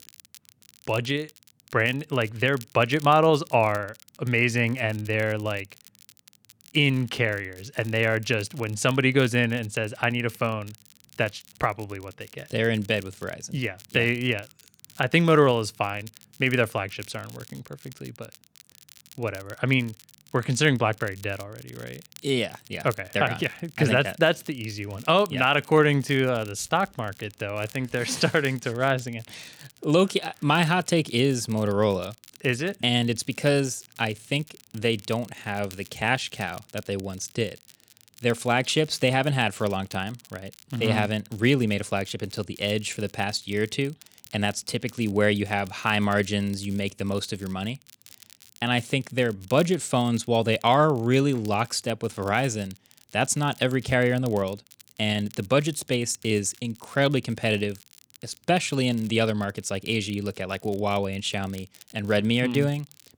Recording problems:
crackle, like an old record; faint; 25 dB below the speech

